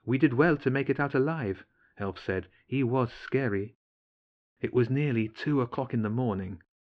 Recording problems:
muffled; slightly; fading above 3.5 kHz

